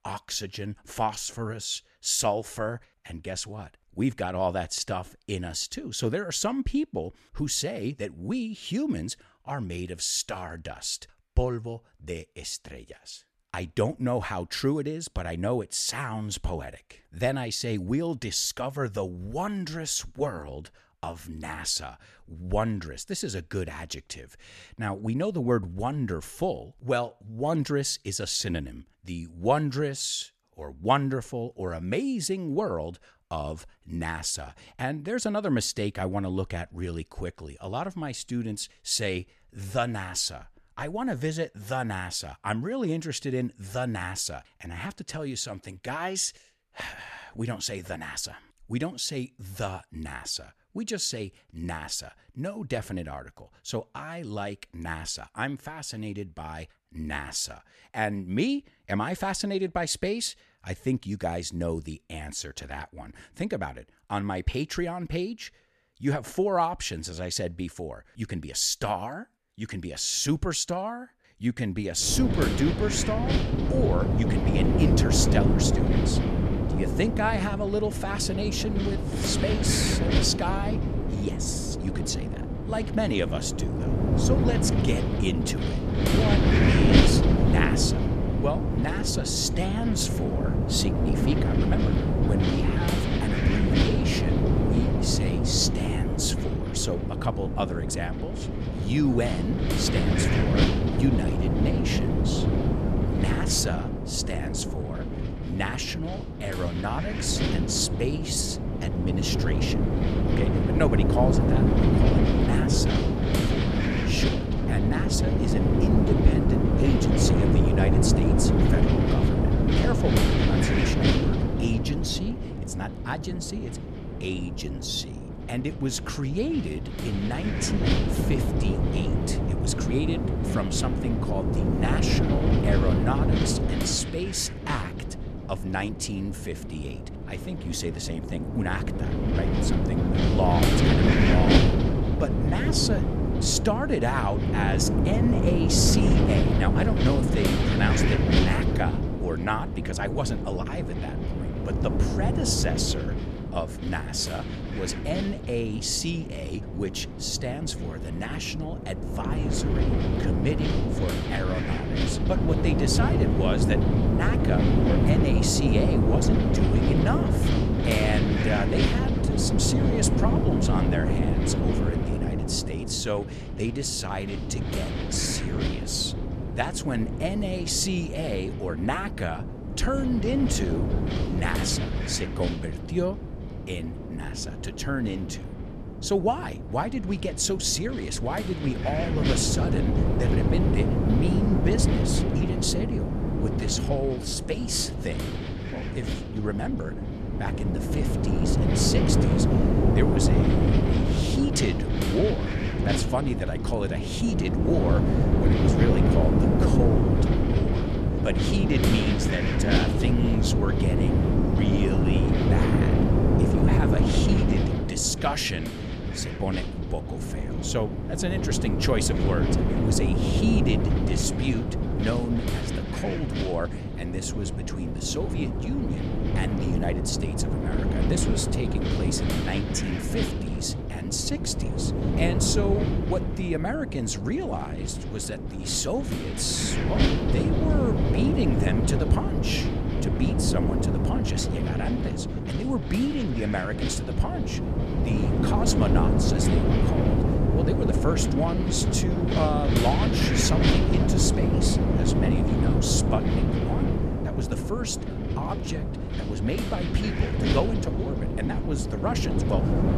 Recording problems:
wind noise on the microphone; heavy; from 1:12 on; as loud as the speech

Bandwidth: 13.5 kHz